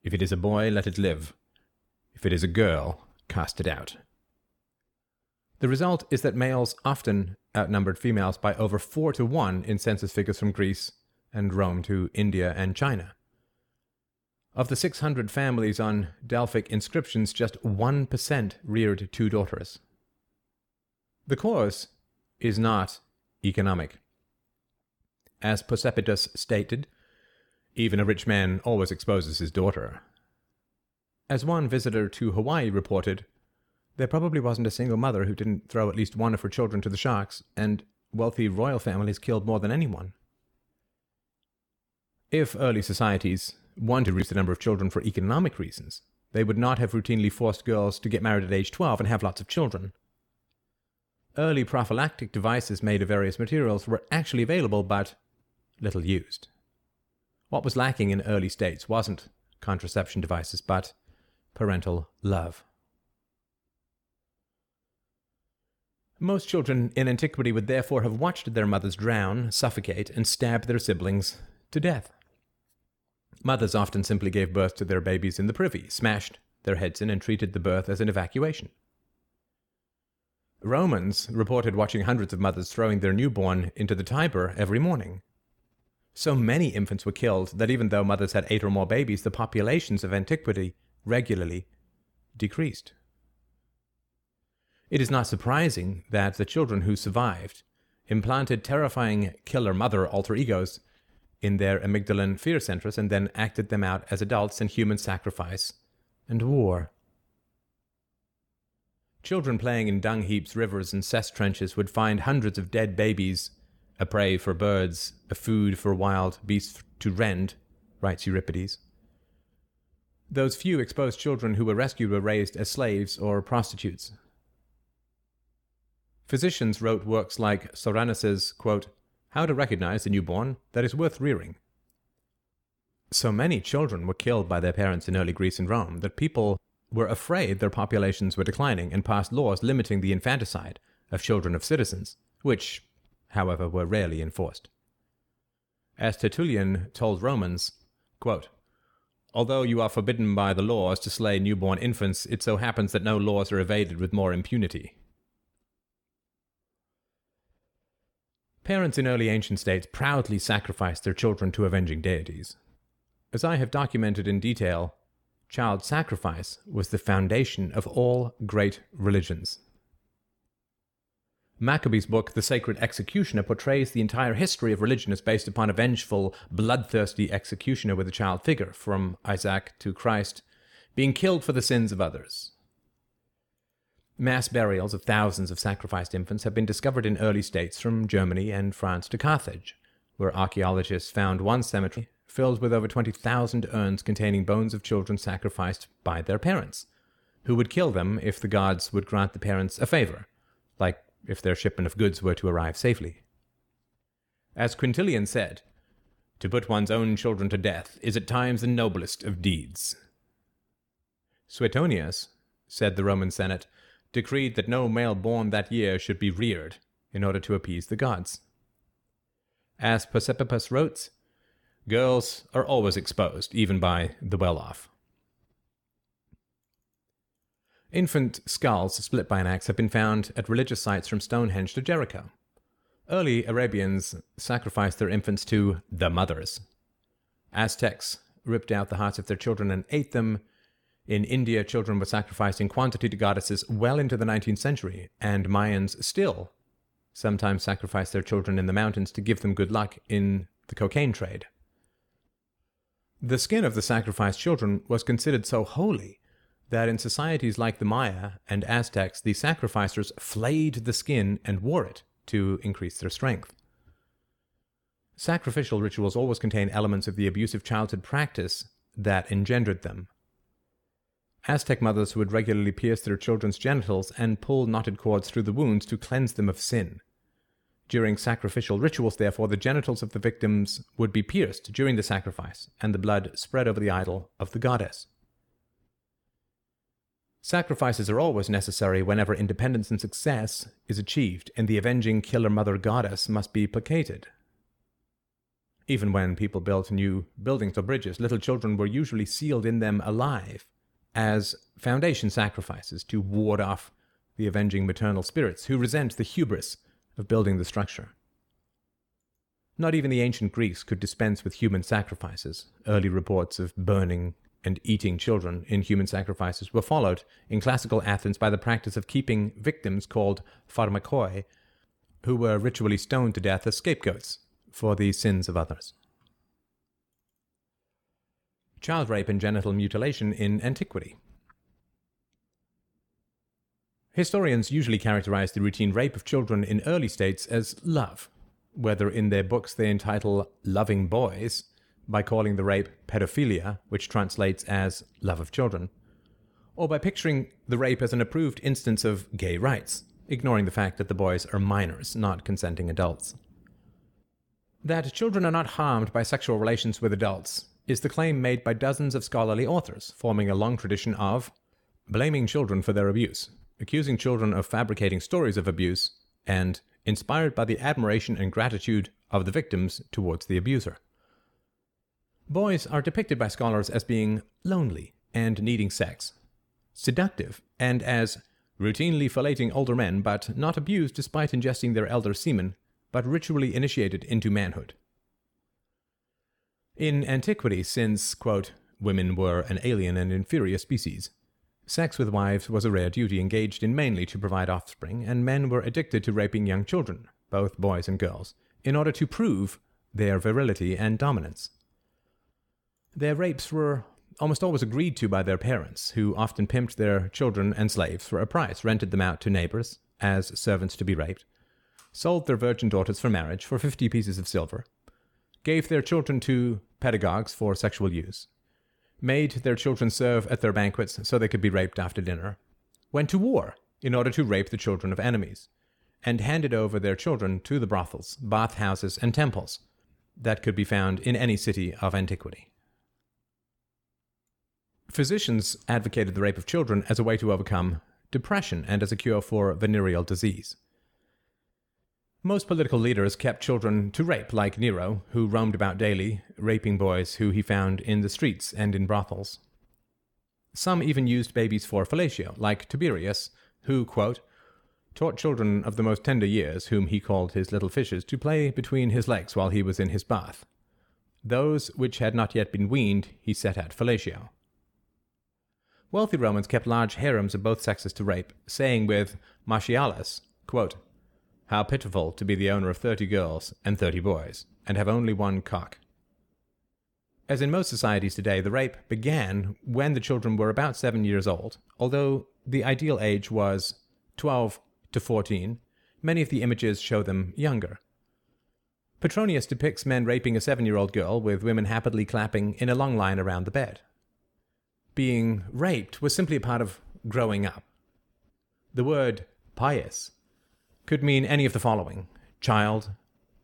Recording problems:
none

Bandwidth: 18 kHz